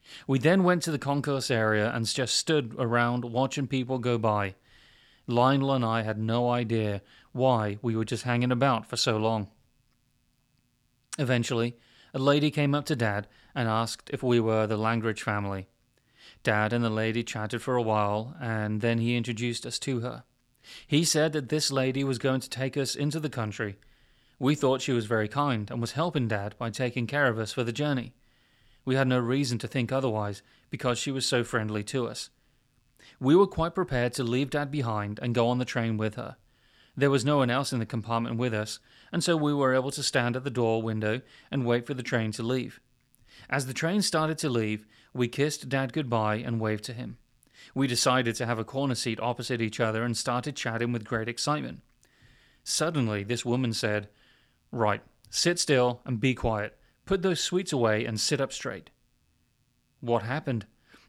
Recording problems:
none

